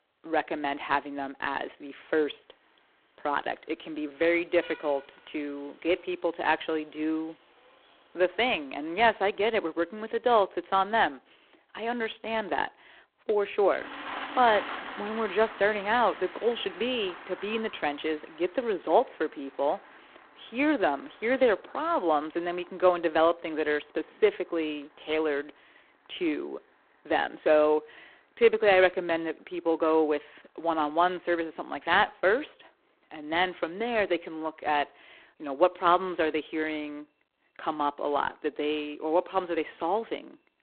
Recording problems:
phone-call audio; poor line
traffic noise; noticeable; throughout; 15 dB below the speech

